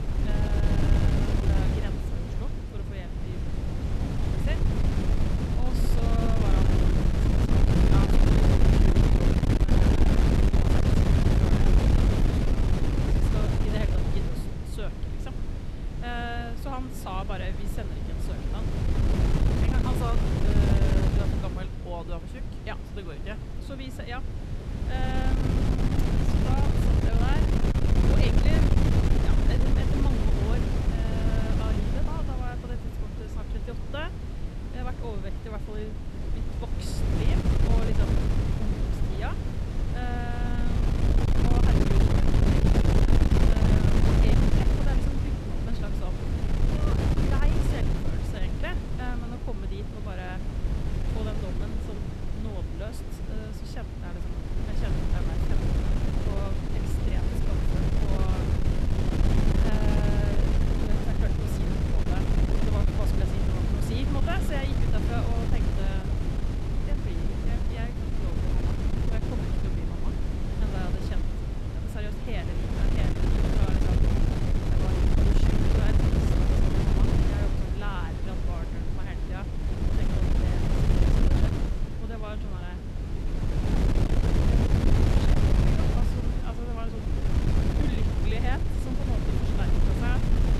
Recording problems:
wind noise on the microphone; heavy; 5 dB above the speech

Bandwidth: 13.5 kHz